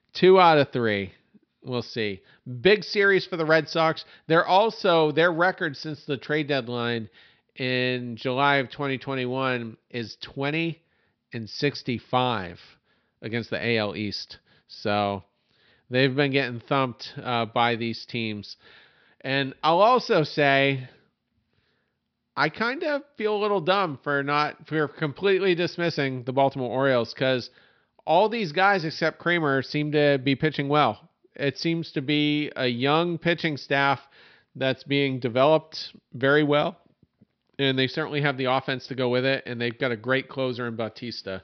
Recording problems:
high frequencies cut off; noticeable; nothing above 5.5 kHz

